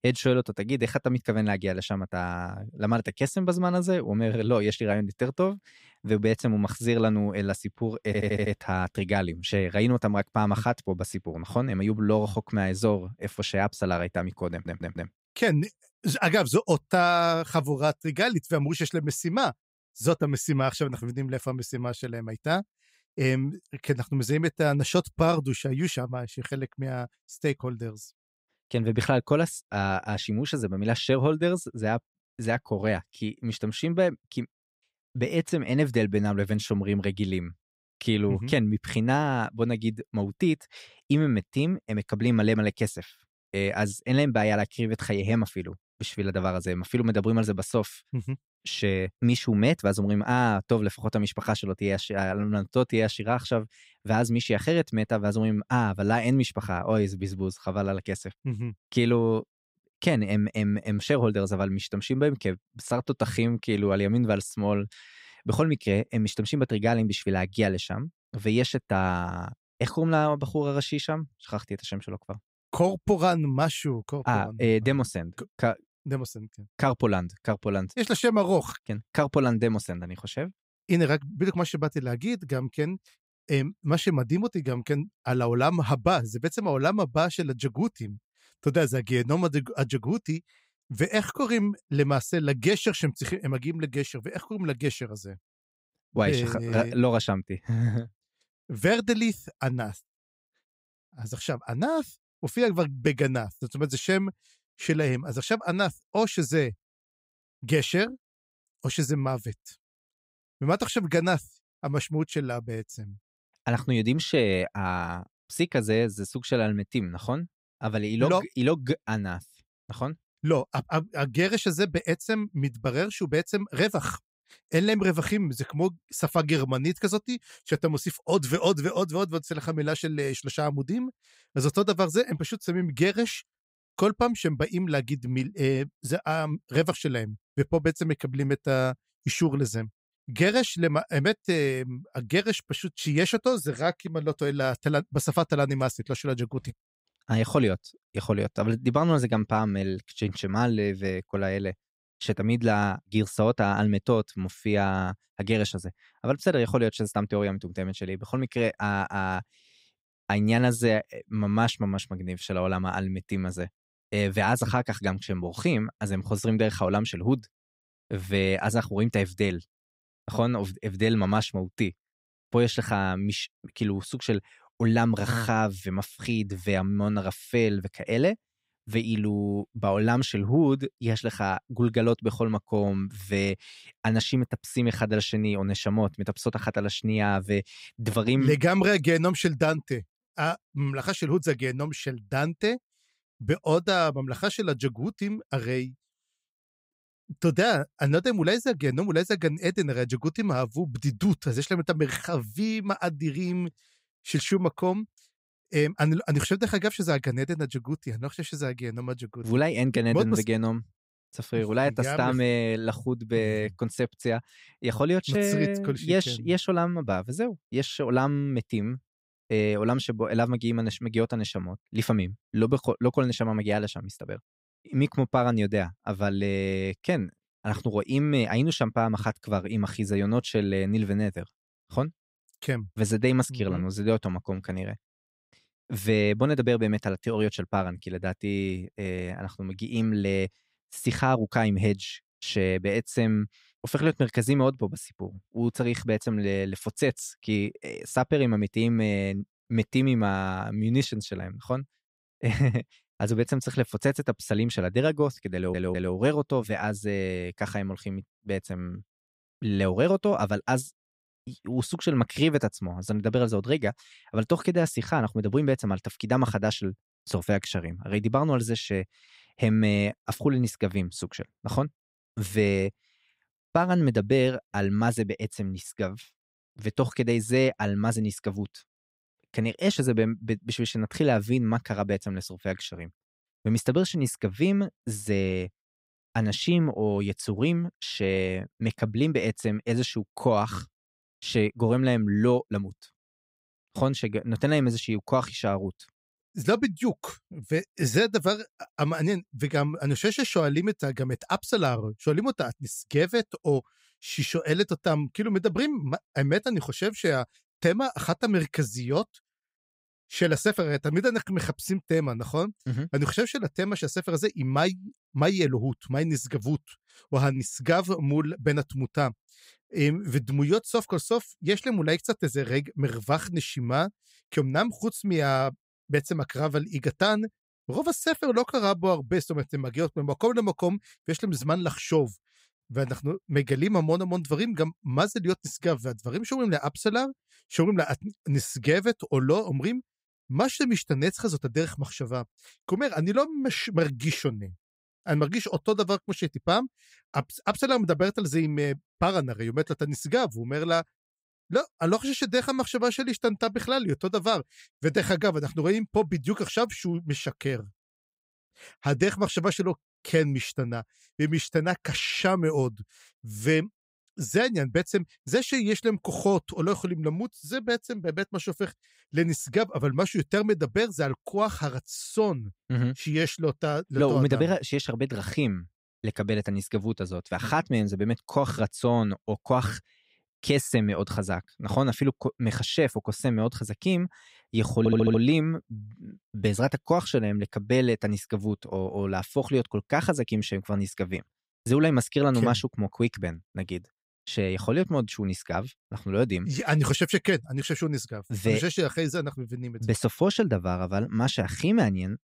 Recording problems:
audio stuttering; 4 times, first at 8 s

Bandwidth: 15.5 kHz